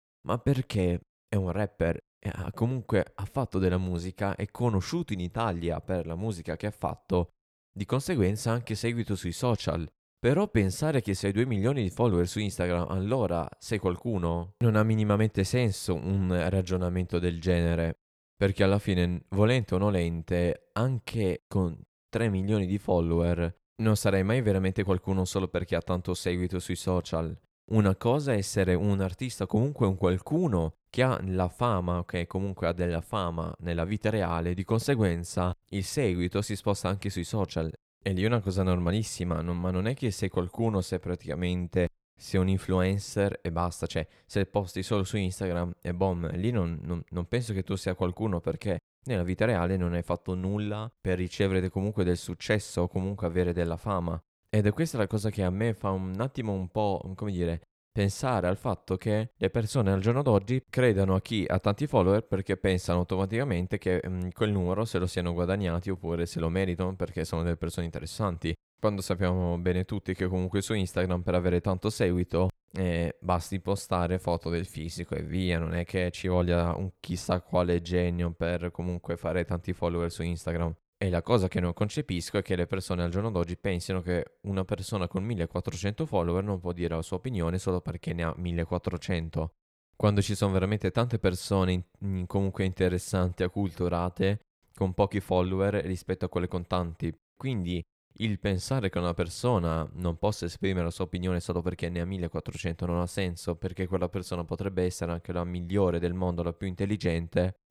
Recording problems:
none

